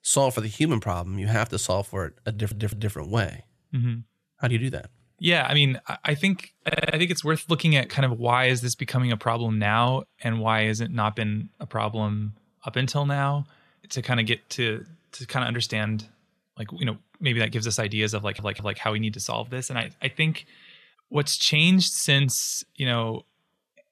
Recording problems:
audio stuttering; at 2.5 s, at 6.5 s and at 18 s

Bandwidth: 13.5 kHz